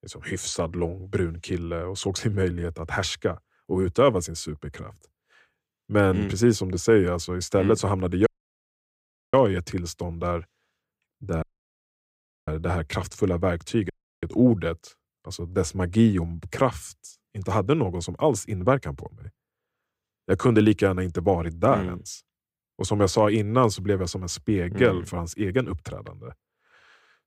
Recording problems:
audio cutting out; at 8.5 s for 1 s, at 11 s for 1 s and at 14 s

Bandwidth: 15.5 kHz